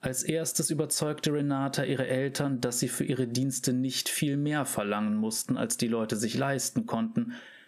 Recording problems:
squashed, flat; somewhat

